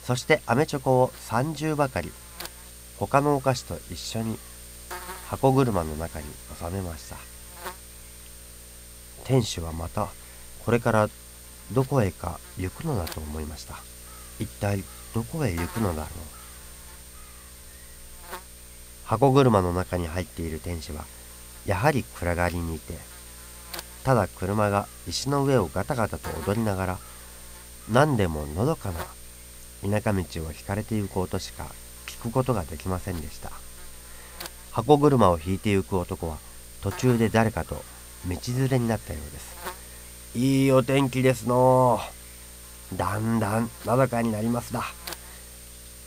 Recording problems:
electrical hum; noticeable; throughout; 60 Hz, 15 dB below the speech

